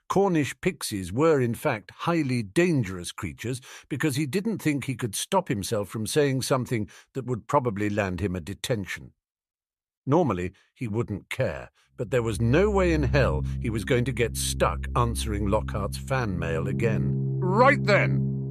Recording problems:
background music; loud; from 13 s on; 4 dB below the speech

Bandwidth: 14 kHz